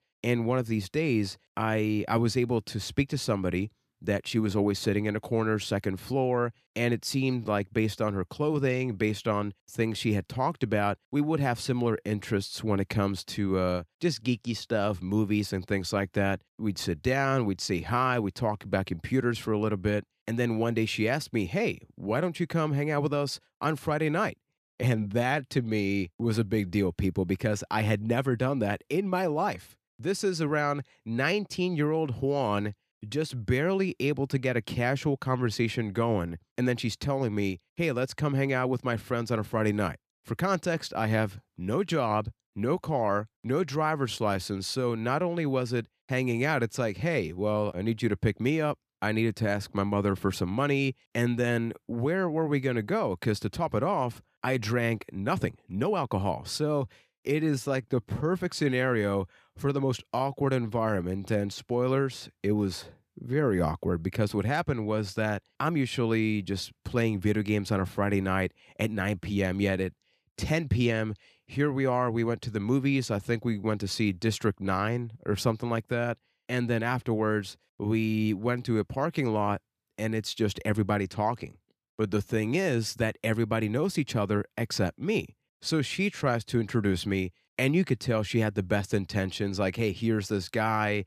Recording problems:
uneven, jittery; strongly; from 25 s to 1:23

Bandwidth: 15 kHz